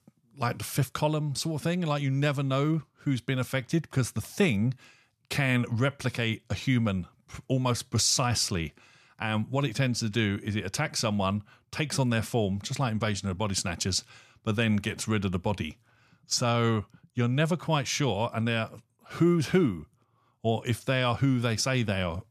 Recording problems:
none

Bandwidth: 14.5 kHz